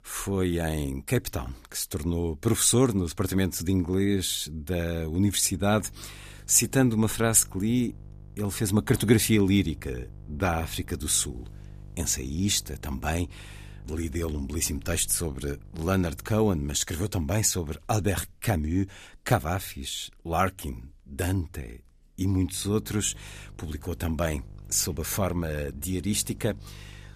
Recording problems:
electrical hum; faint; from 5.5 to 17 s and from 23 s on; 50 Hz, 30 dB below the speech

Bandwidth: 14.5 kHz